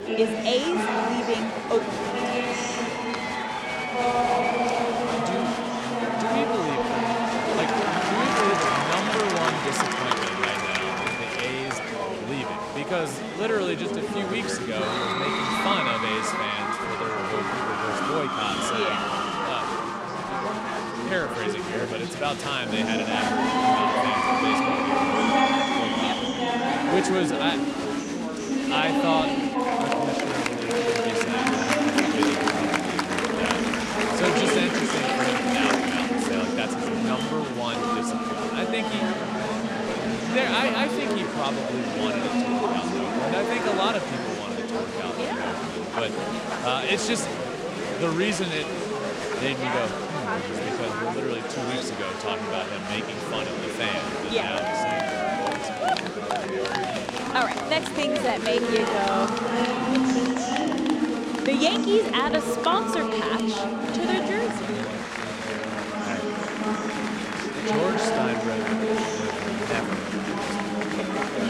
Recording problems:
chatter from many people; very loud; throughout; 4 dB above the speech

